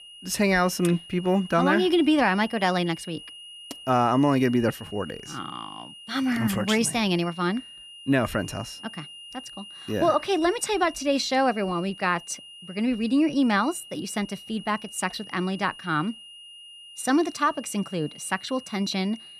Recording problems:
high-pitched whine; noticeable; throughout; 3 kHz, 15 dB below the speech

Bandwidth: 14 kHz